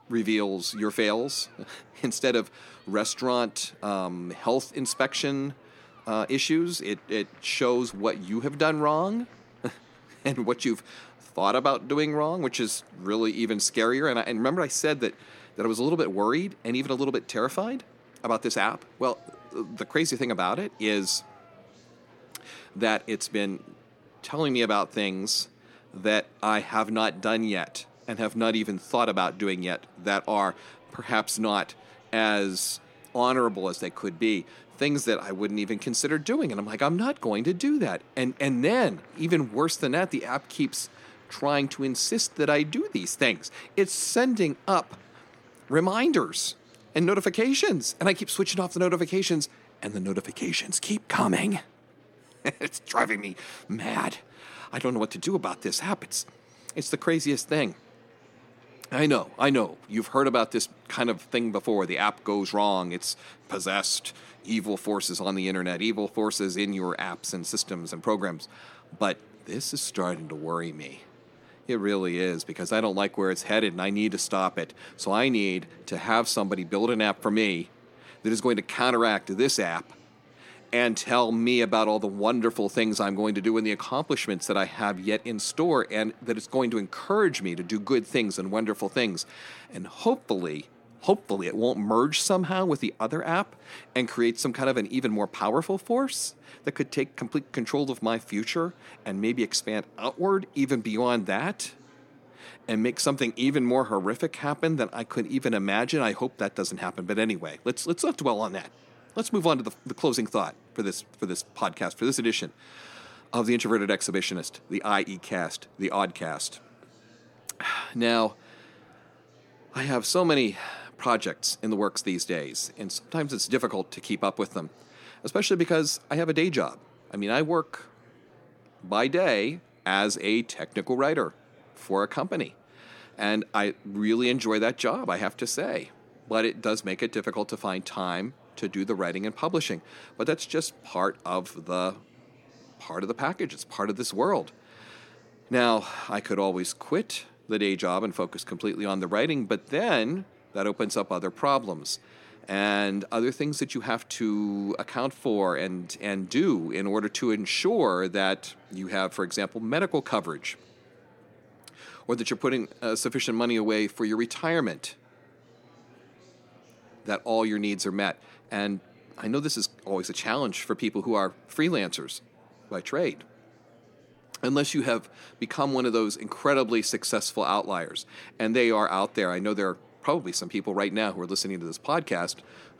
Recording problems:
murmuring crowd; faint; throughout; 30 dB below the speech

